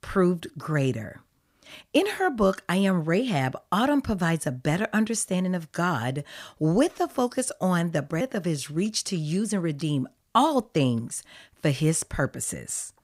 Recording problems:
none

